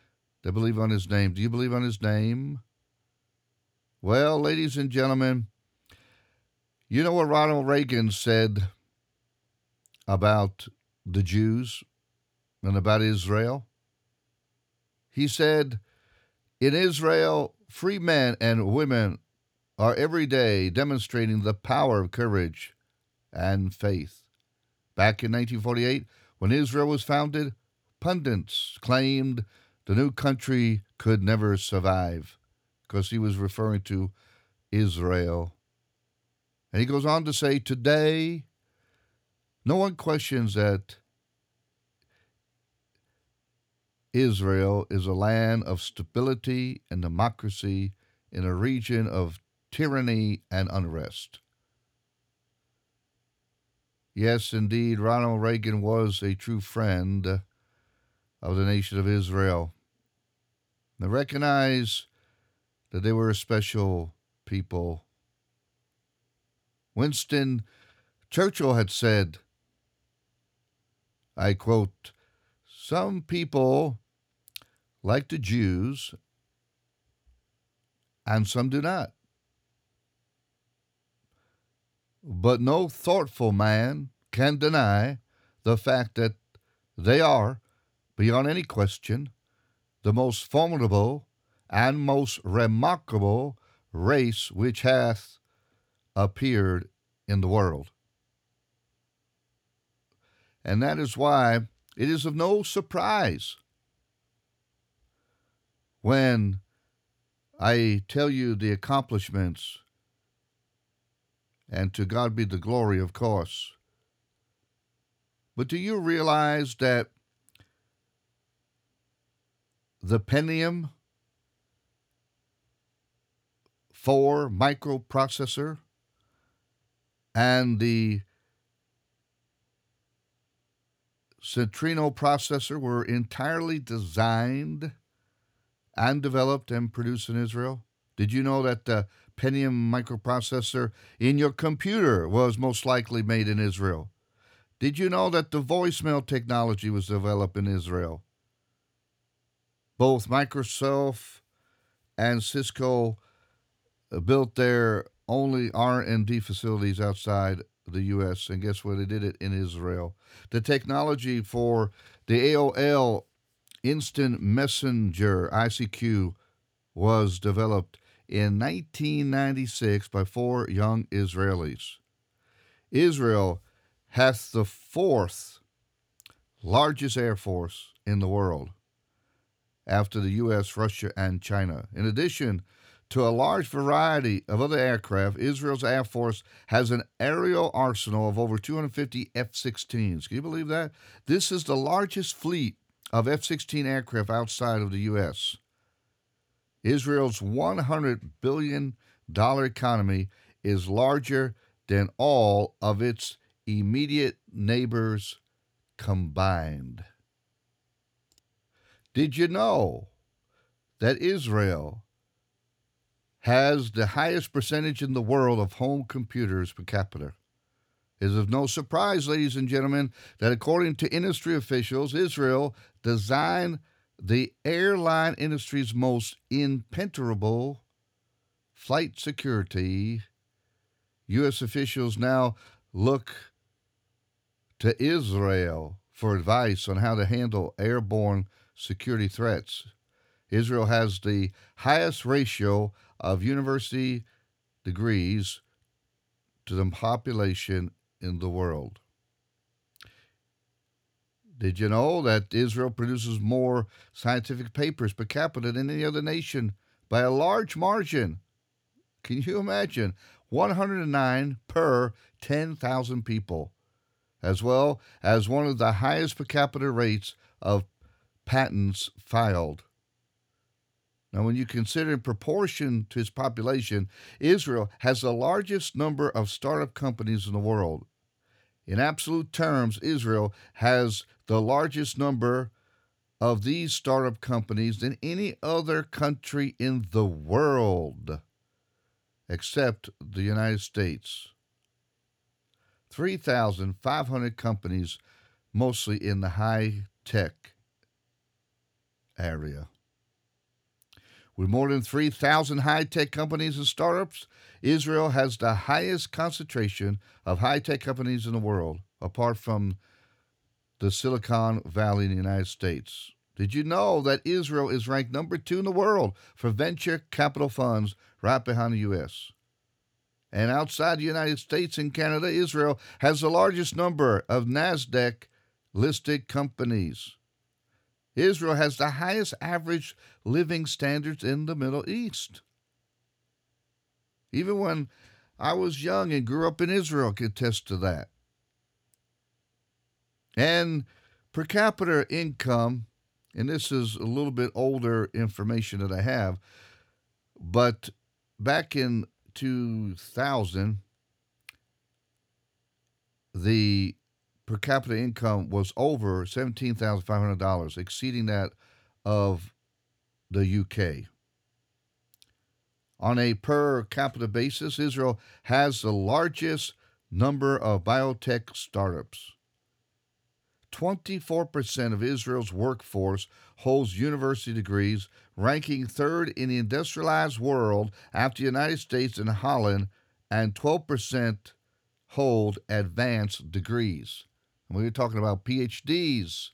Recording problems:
none

